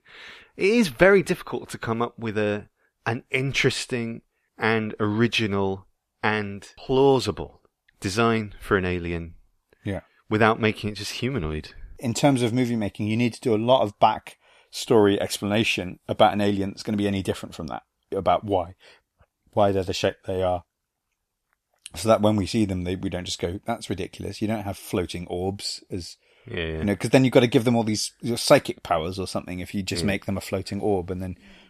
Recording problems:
none

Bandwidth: 14.5 kHz